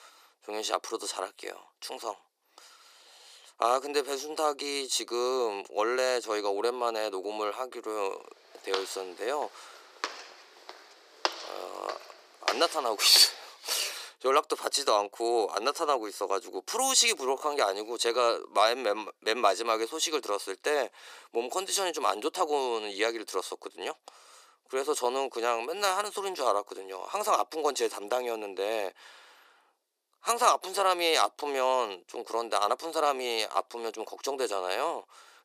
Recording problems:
thin; very; fading below 350 Hz
footsteps; noticeable; from 8.5 to 13 s; peak 4 dB below the speech

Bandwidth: 15 kHz